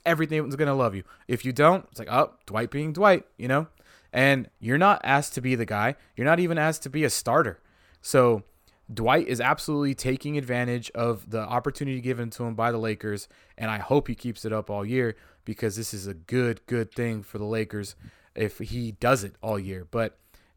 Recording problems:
none

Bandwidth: 18 kHz